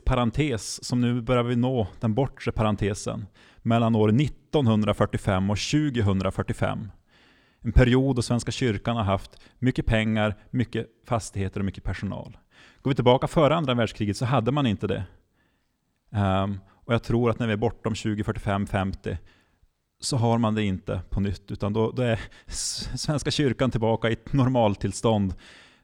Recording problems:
none

